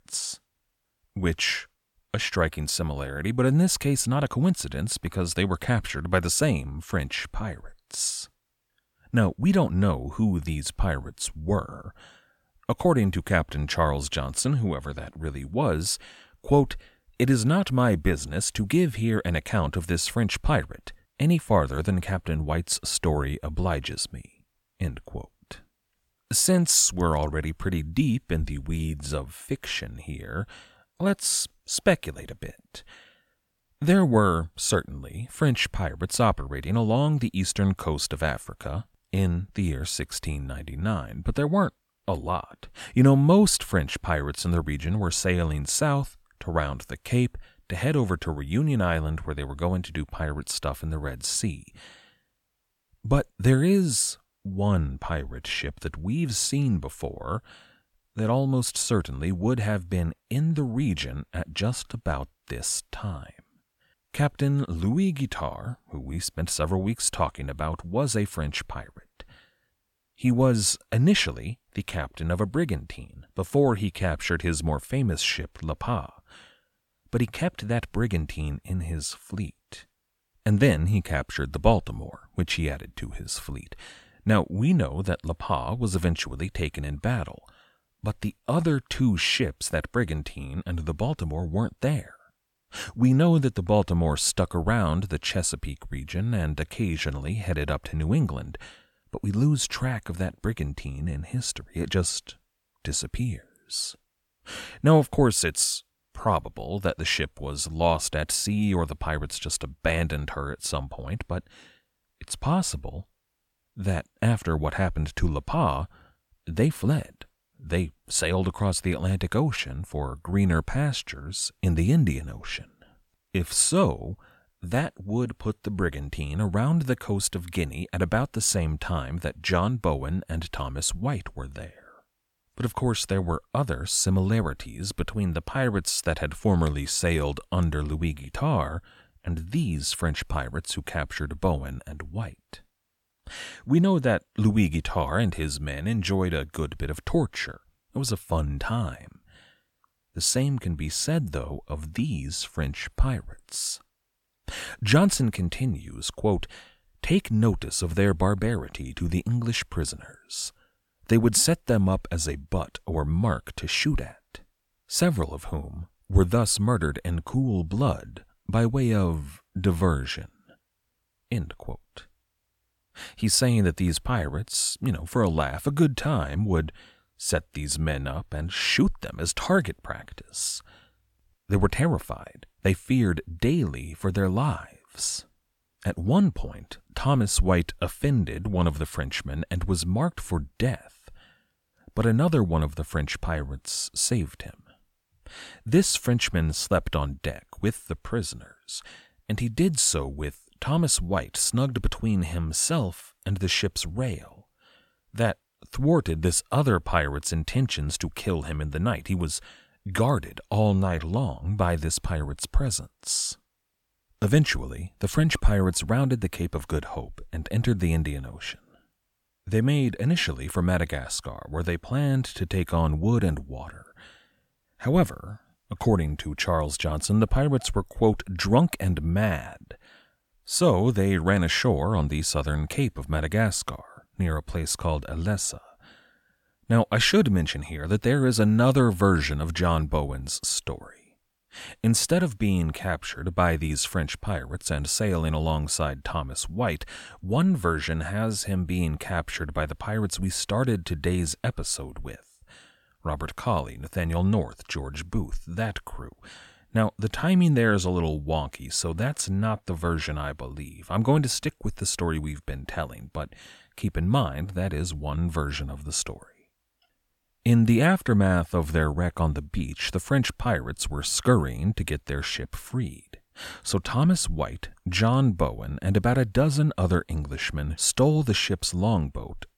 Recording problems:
none

